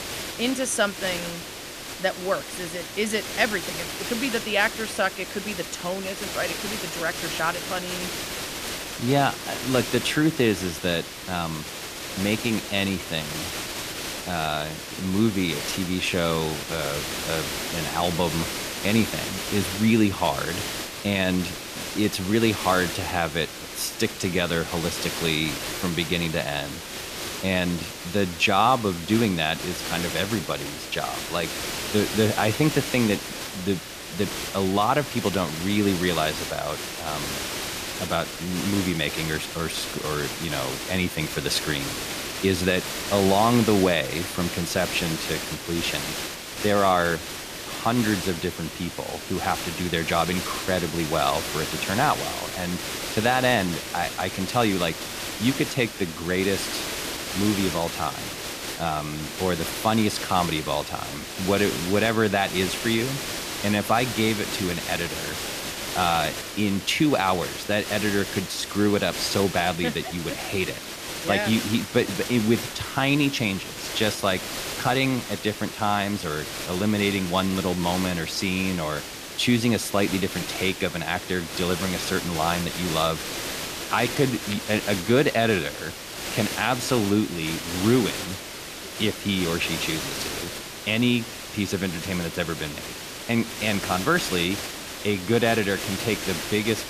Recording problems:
hiss; loud; throughout; 6 dB below the speech

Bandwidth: 14.5 kHz